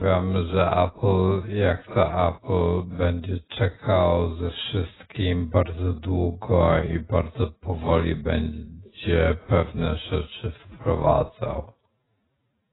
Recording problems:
garbled, watery; badly; nothing above 4 kHz
wrong speed, natural pitch; too slow; 0.5 times normal speed
abrupt cut into speech; at the start

